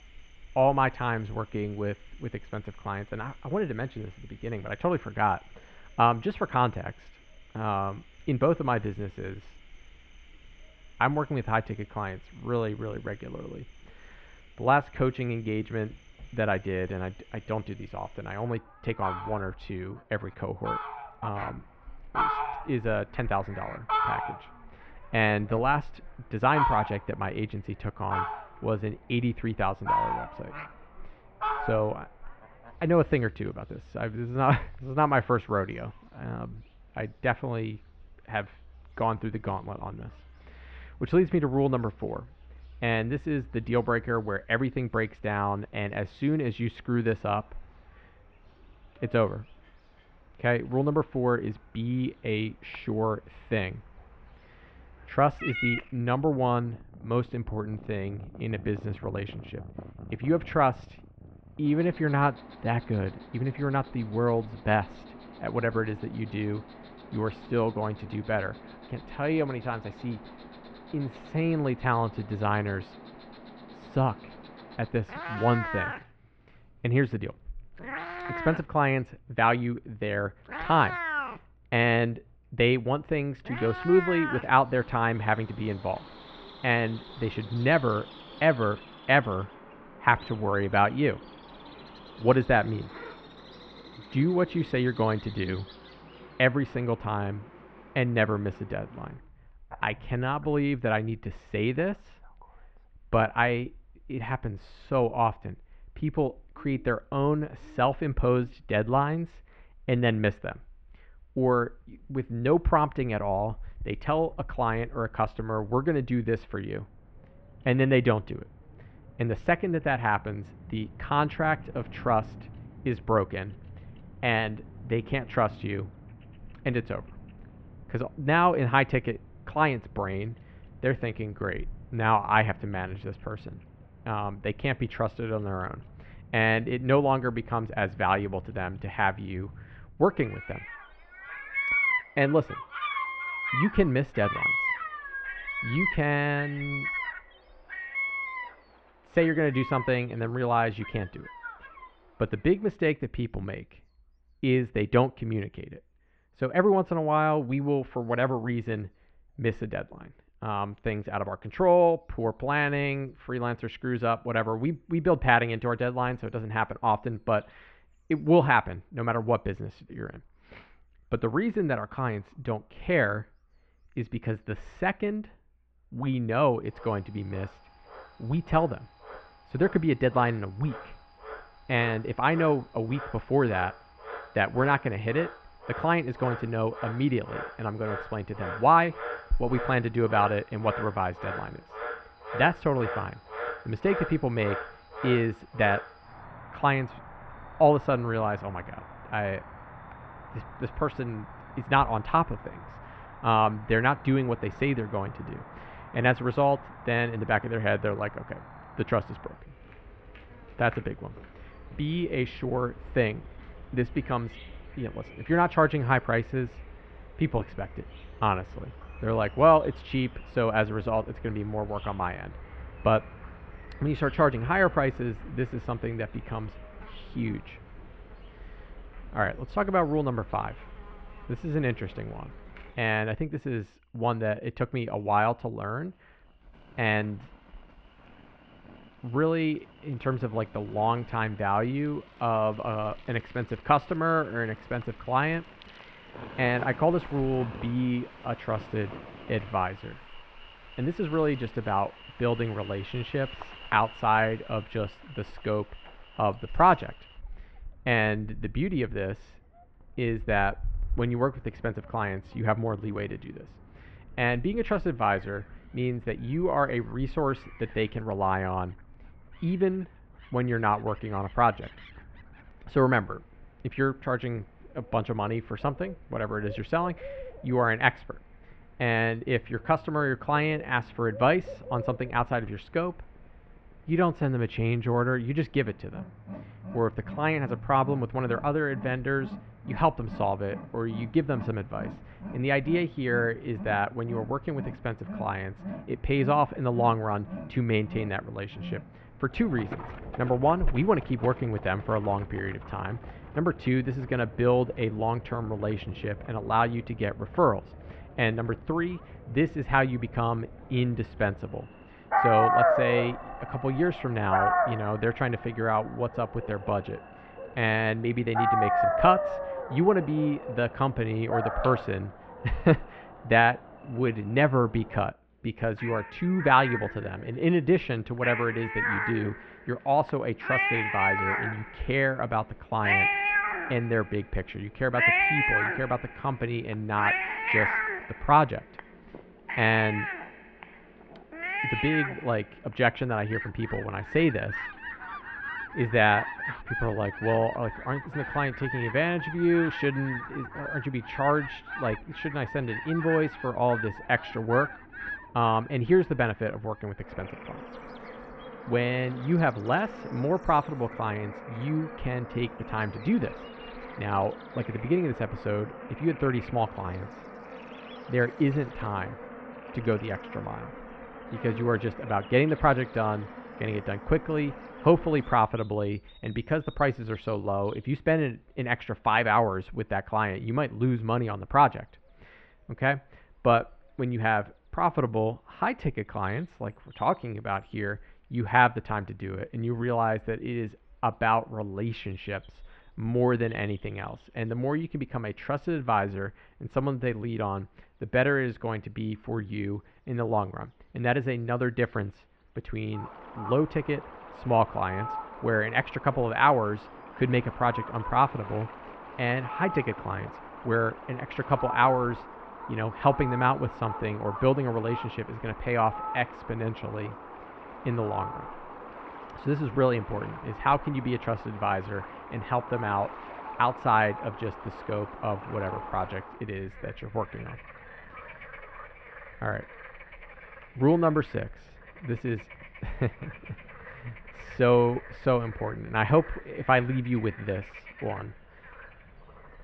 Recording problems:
muffled; very; fading above 2.5 kHz
animal sounds; loud; throughout; 8 dB below the speech

